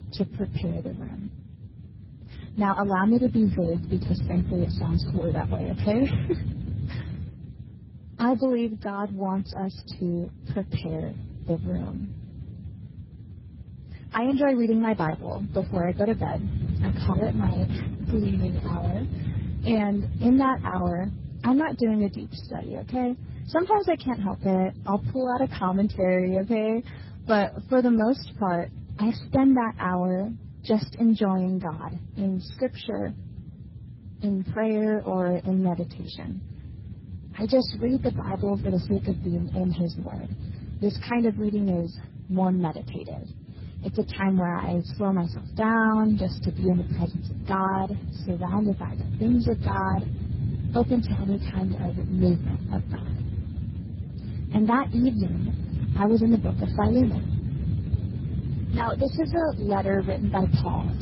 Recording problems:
garbled, watery; badly; nothing above 5.5 kHz
wind noise on the microphone; occasional gusts; 15 dB below the speech

